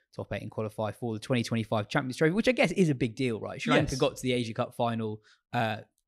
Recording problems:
none

